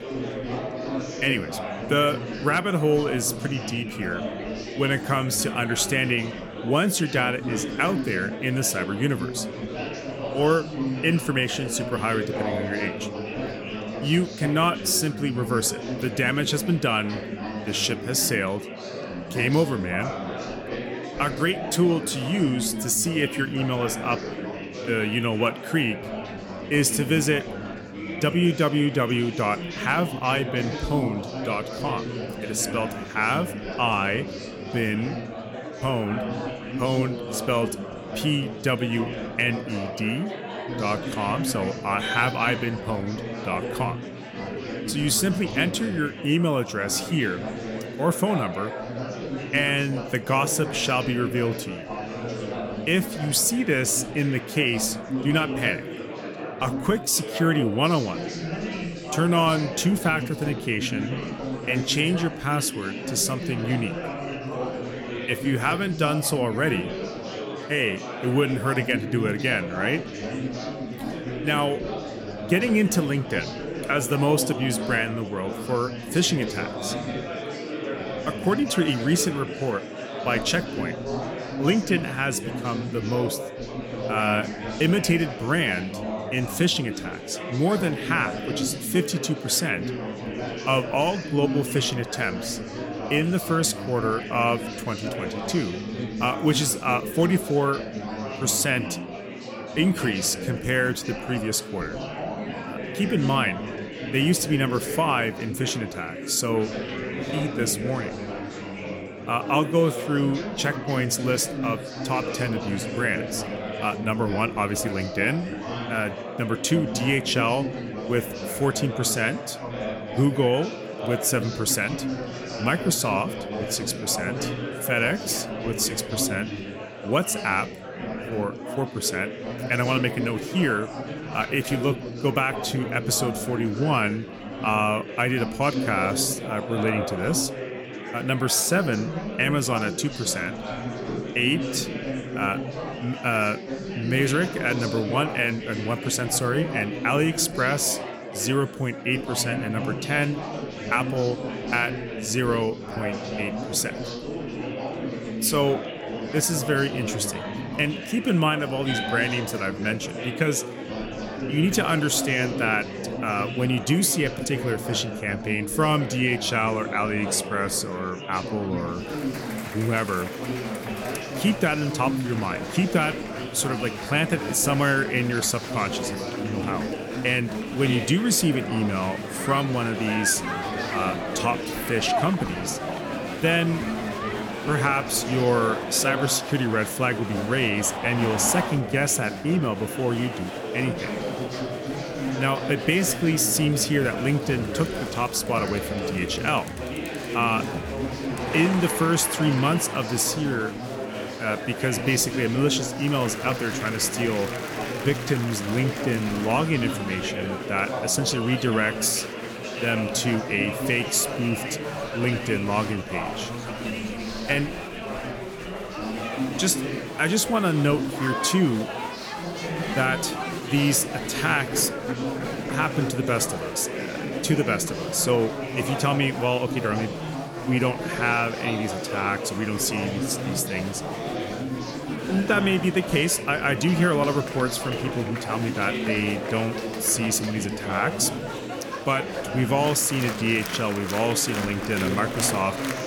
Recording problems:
murmuring crowd; loud; throughout; 7 dB below the speech

